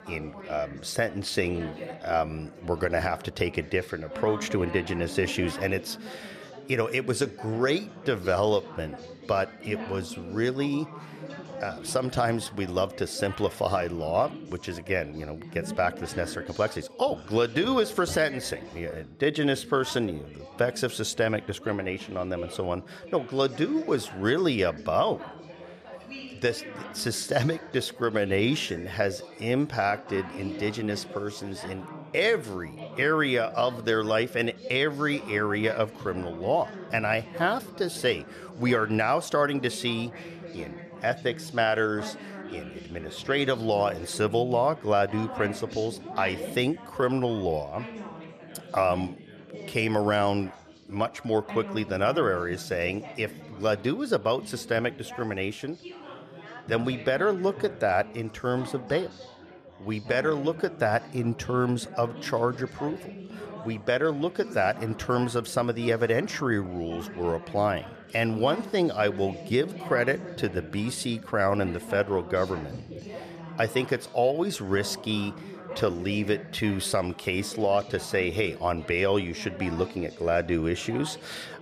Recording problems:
chatter from many people; noticeable; throughout; 15 dB below the speech

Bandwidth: 14.5 kHz